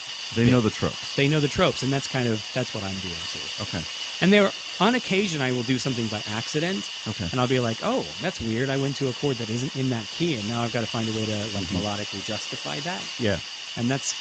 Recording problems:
garbled, watery; slightly; nothing above 7.5 kHz
hiss; loud; throughout; 5 dB below the speech

